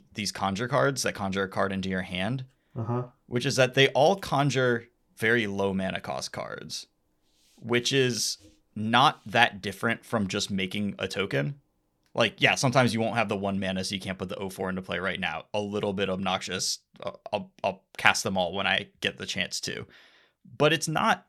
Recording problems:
none

